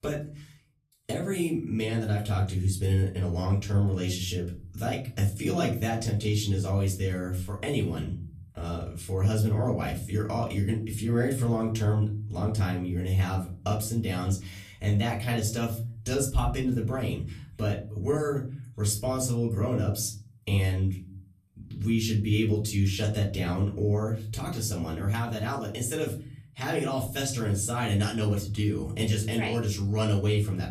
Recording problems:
off-mic speech; far
room echo; slight; dies away in 0.6 s

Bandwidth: 14.5 kHz